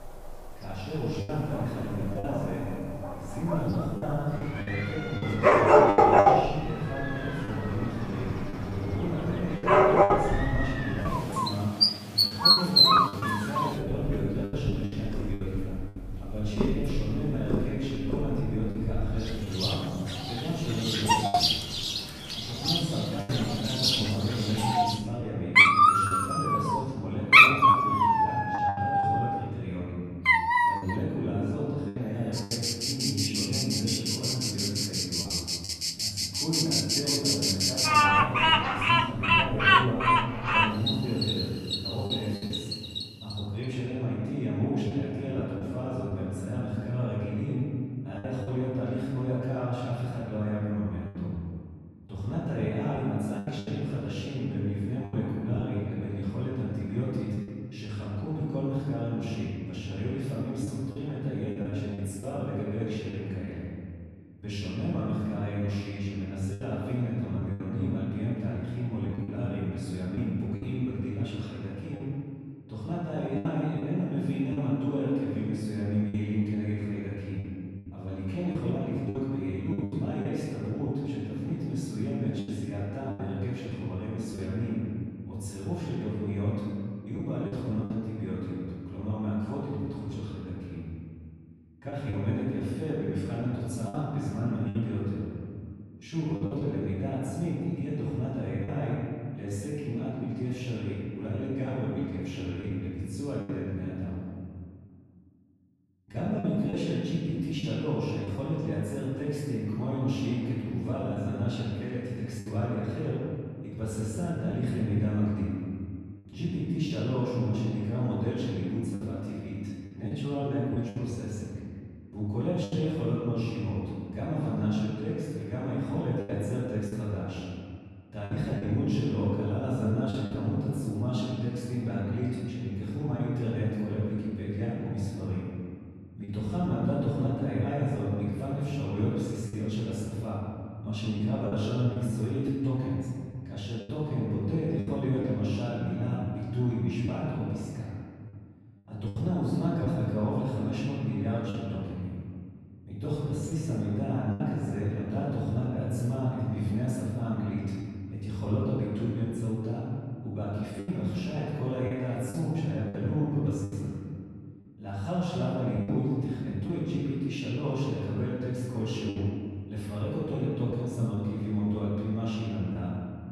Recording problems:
room echo; strong; dies away in 2.1 s
off-mic speech; far
animal sounds; very loud; until 43 s; 8 dB above the speech
choppy; occasionally; 5% of the speech affected

